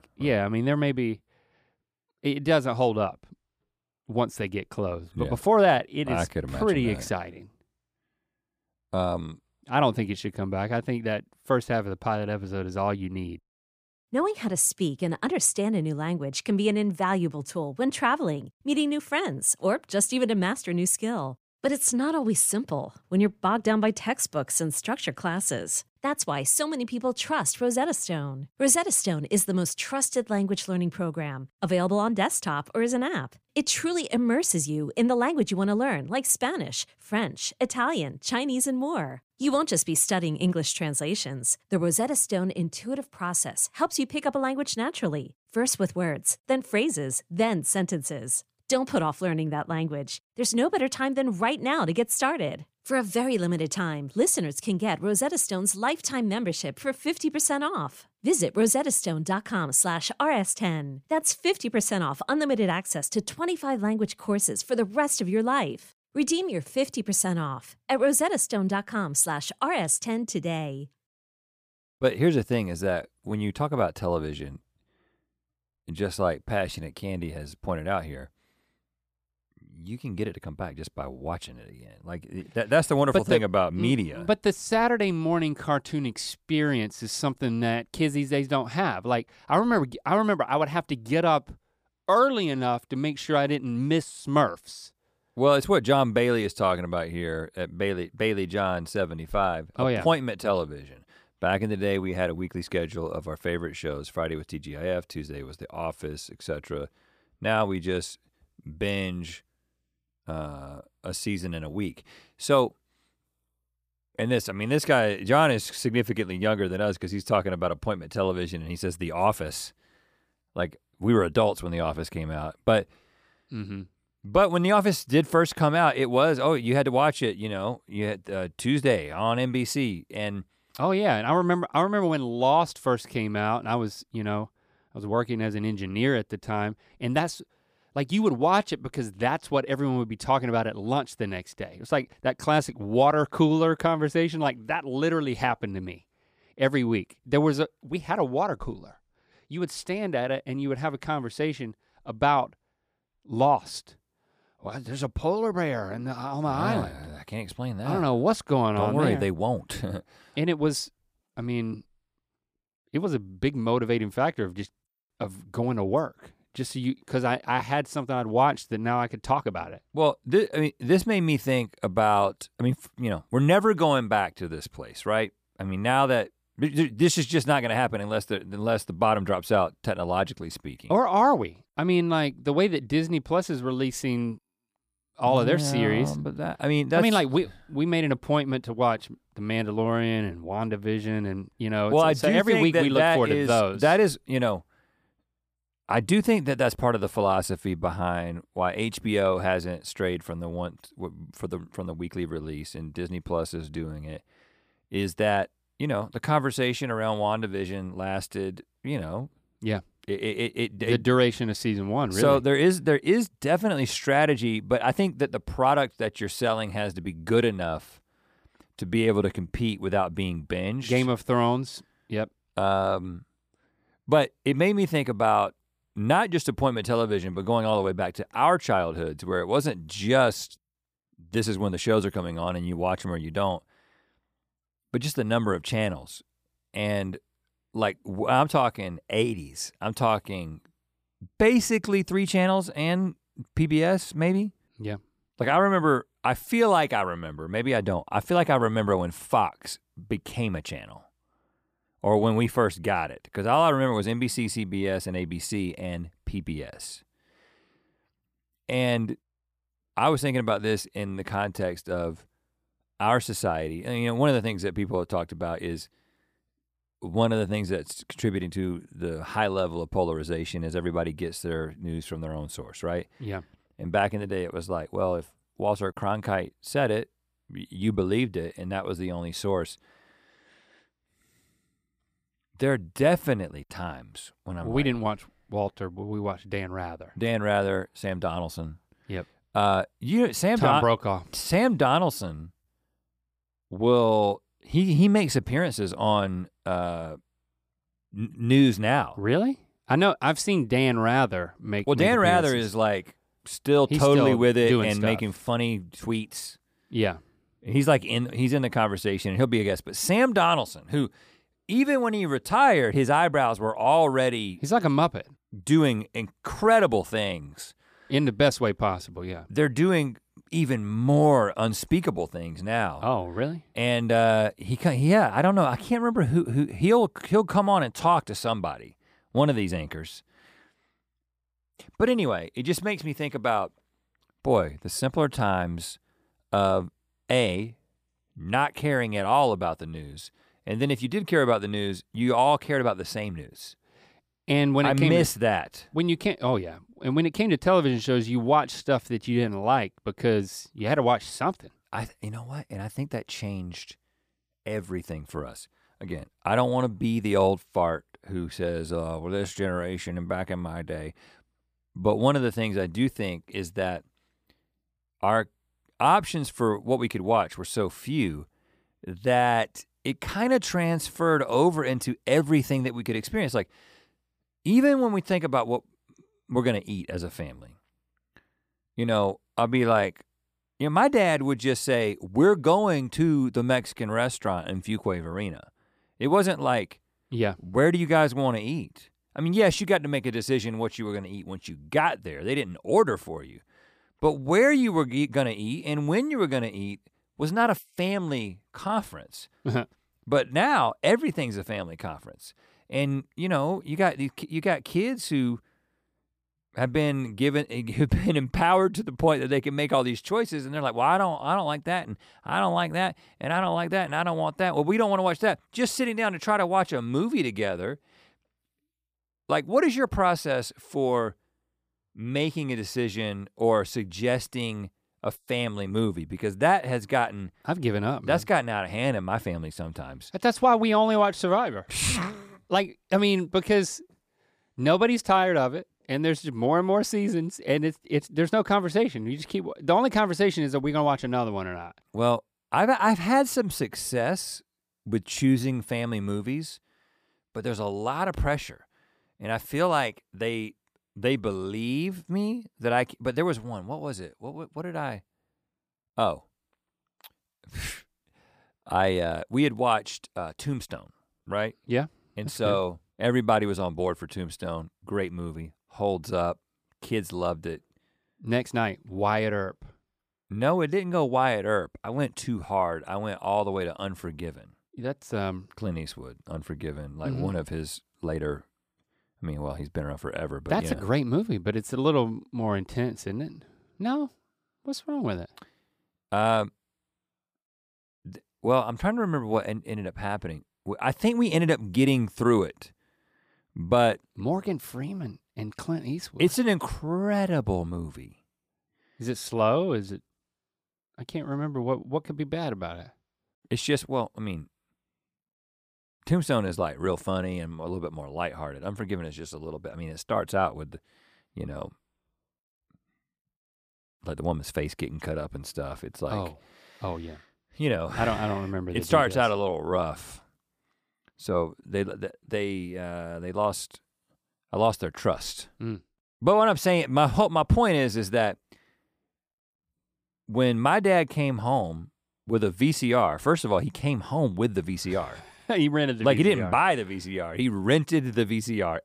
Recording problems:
none

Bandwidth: 15 kHz